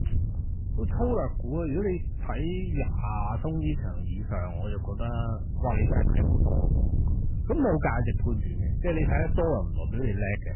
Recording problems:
garbled, watery; badly; nothing above 3 kHz
distortion; slight; 10 dB below the speech
wind noise on the microphone; occasional gusts; 10 dB below the speech

